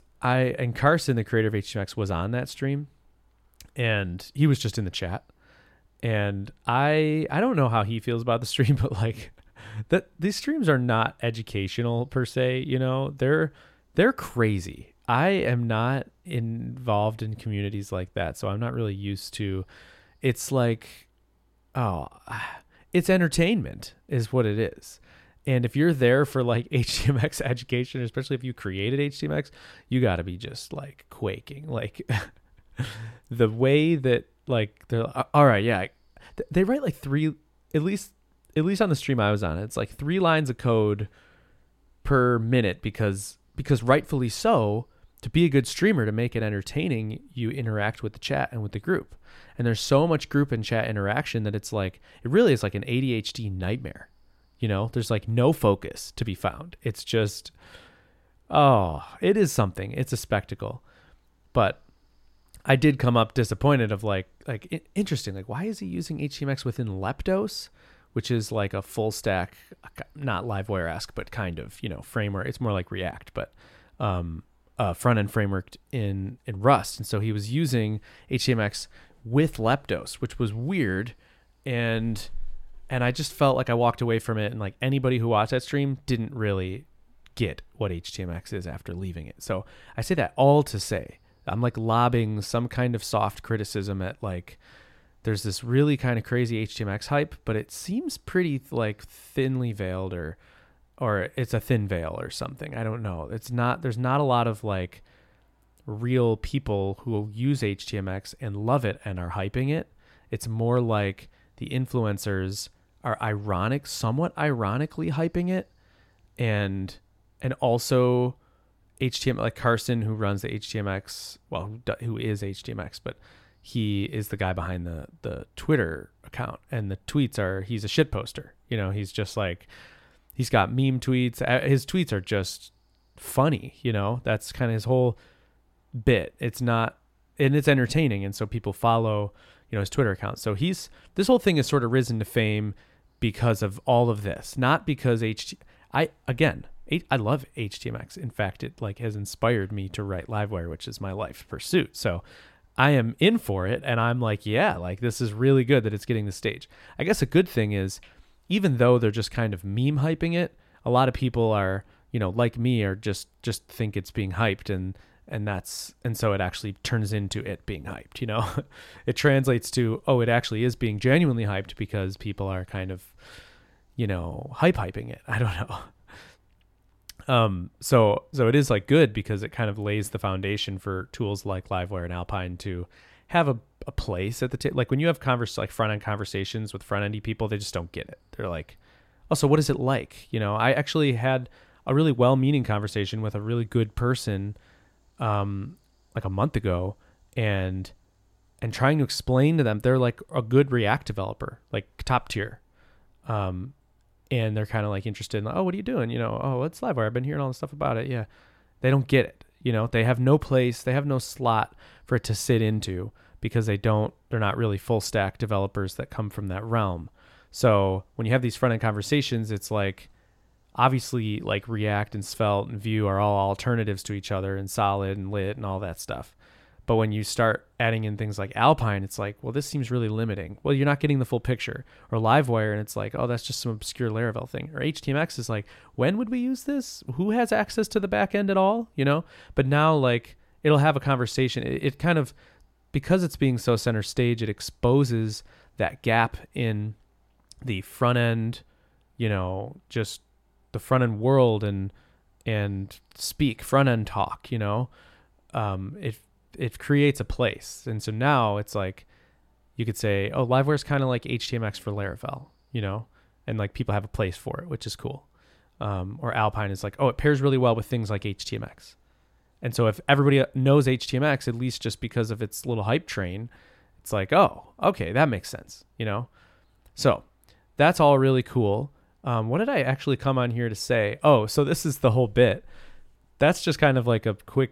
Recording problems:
none

